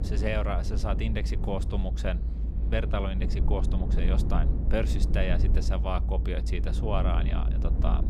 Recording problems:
low rumble; loud; throughout; 9 dB below the speech

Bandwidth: 15 kHz